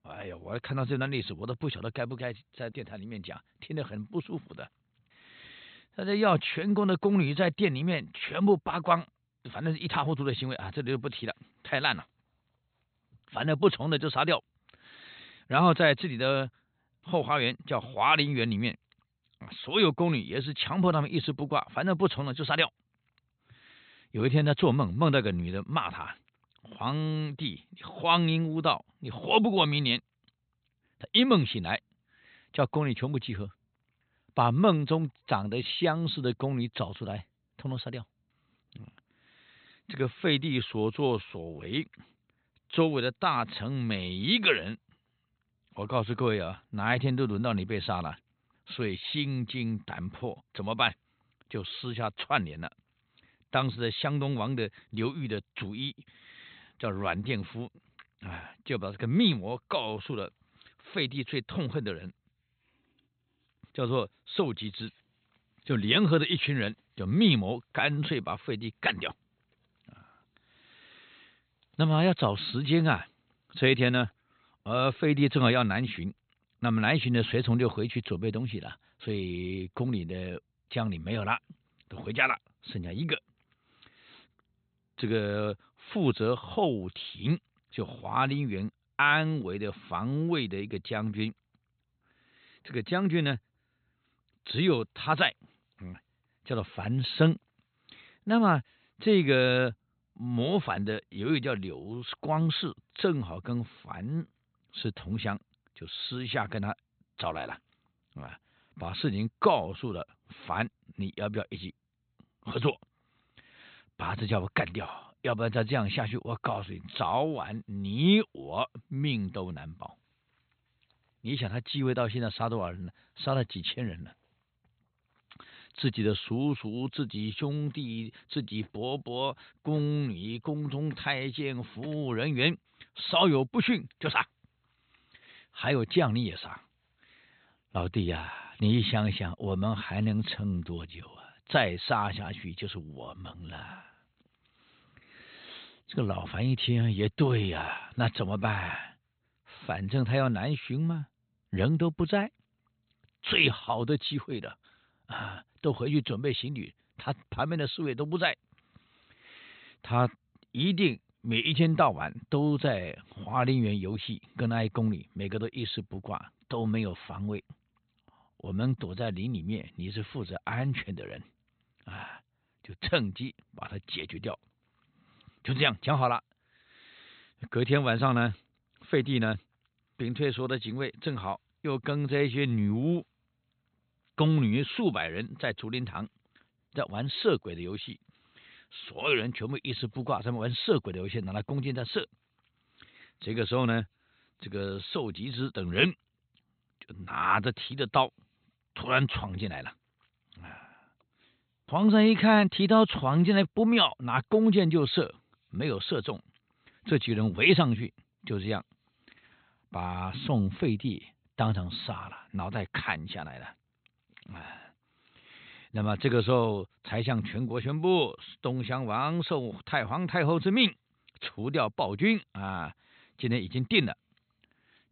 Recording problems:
high frequencies cut off; severe; nothing above 4 kHz

